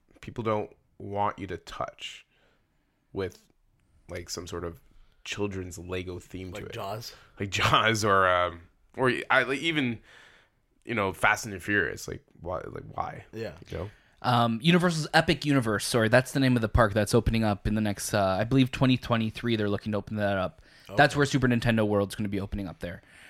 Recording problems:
none

